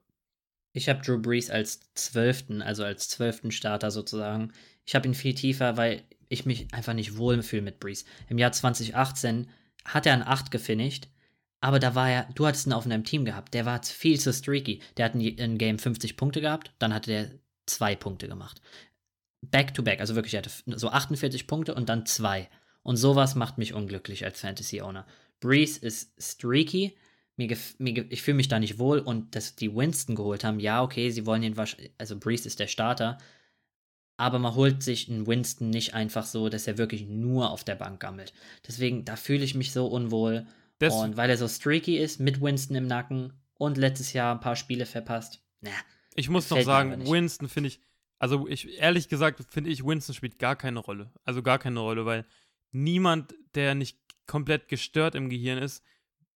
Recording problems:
none

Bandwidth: 17 kHz